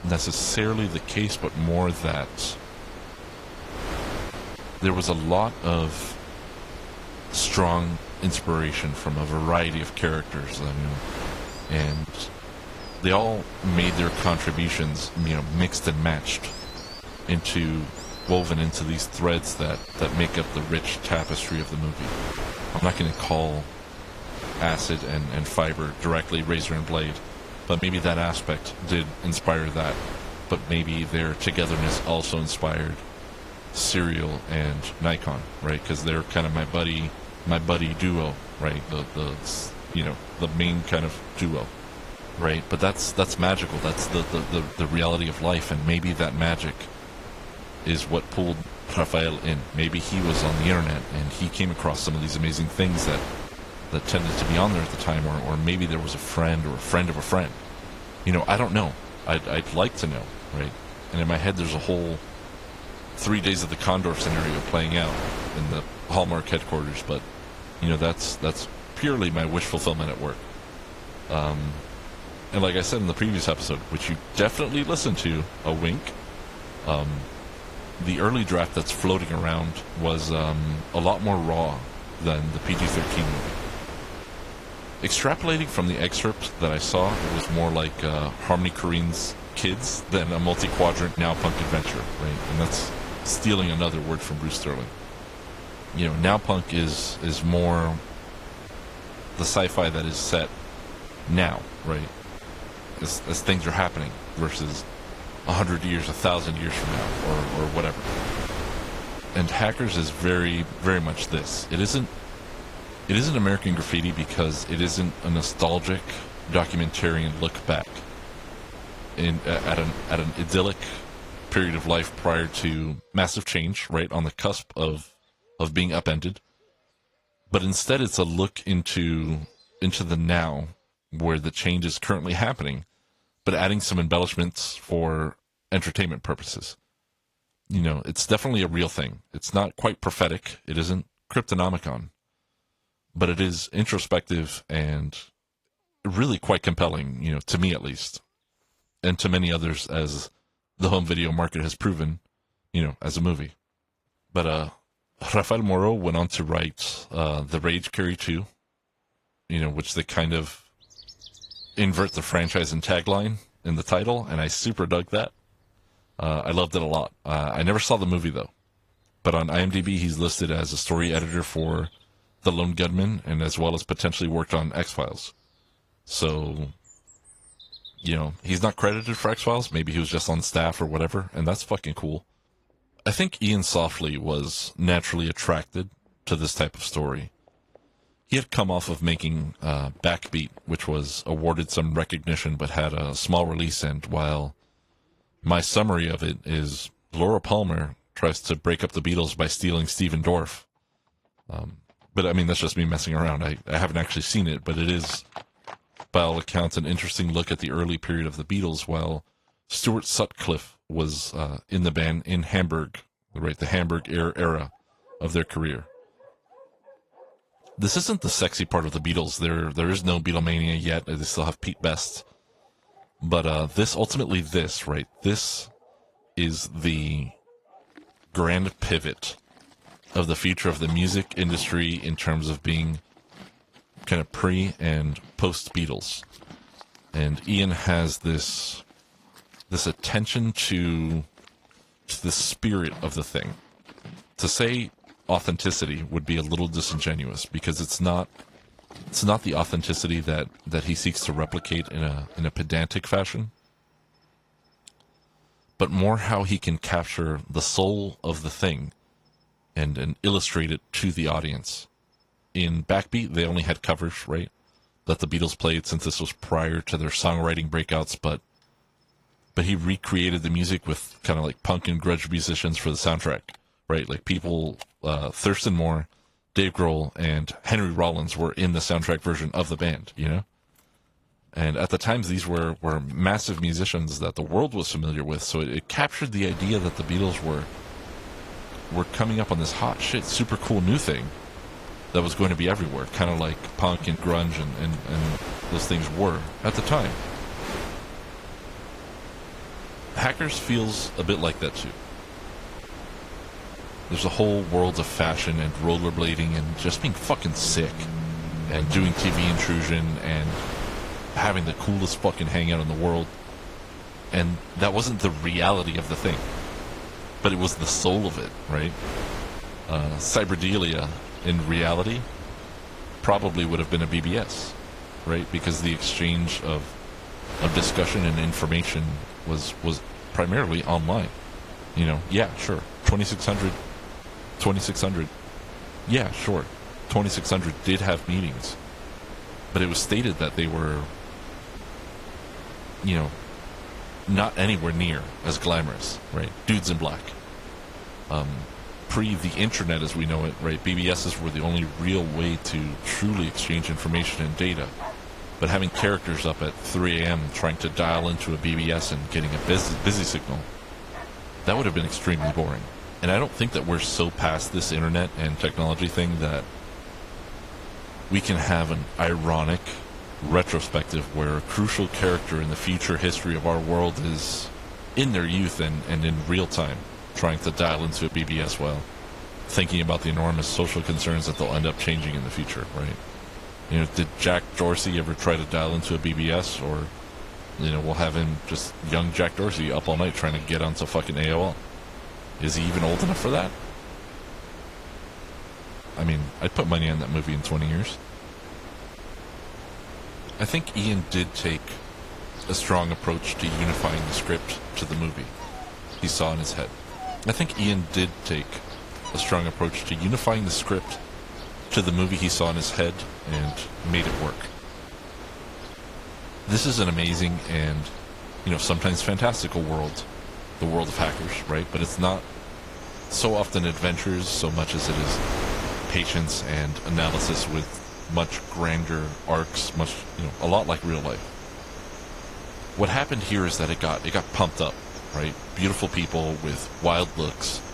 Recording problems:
garbled, watery; slightly
wind noise on the microphone; occasional gusts; until 2:03 and from 4:47 on; 10 dB below the speech
animal sounds; faint; throughout; 20 dB below the speech

